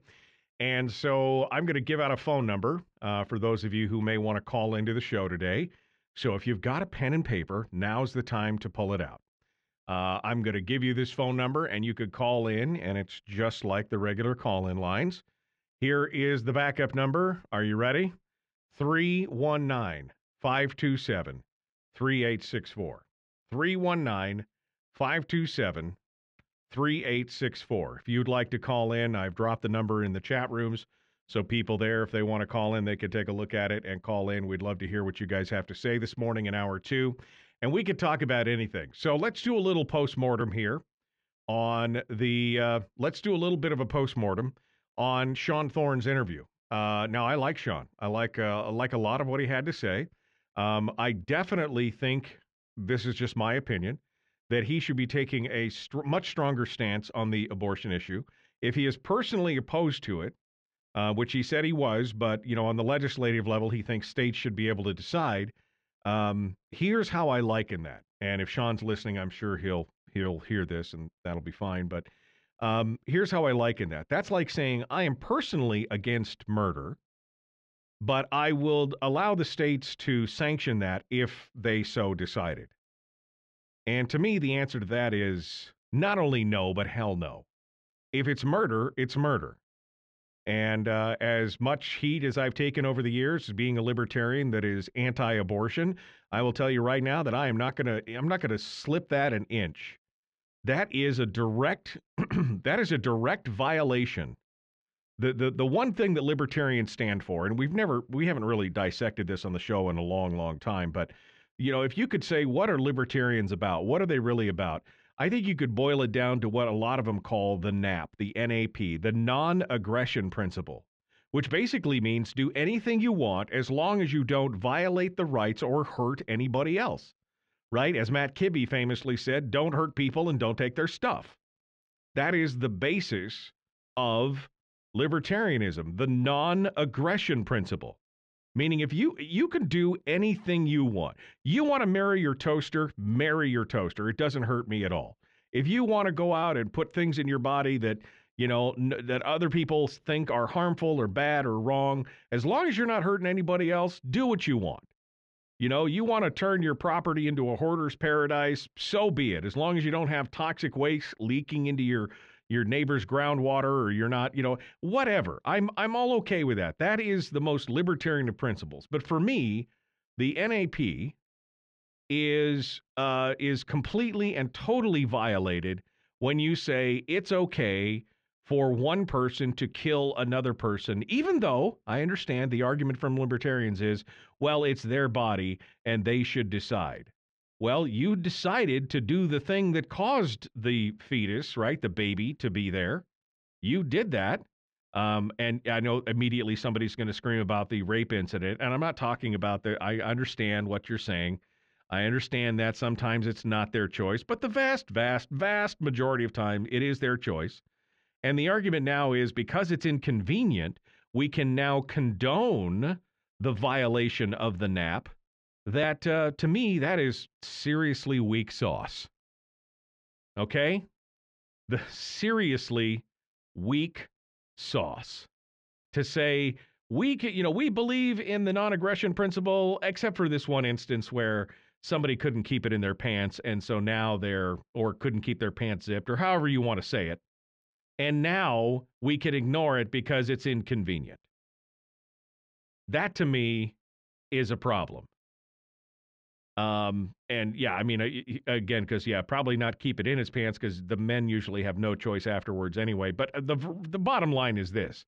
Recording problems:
muffled; slightly; fading above 3.5 kHz

